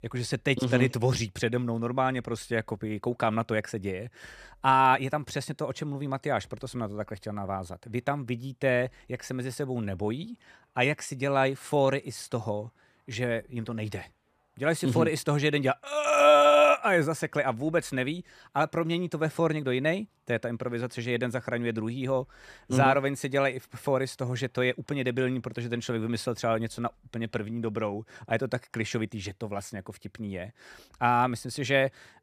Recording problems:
none

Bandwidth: 14.5 kHz